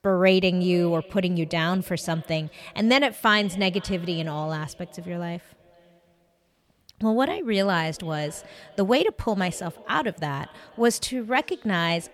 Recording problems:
echo of what is said; faint; throughout; 490 ms later, 25 dB below the speech

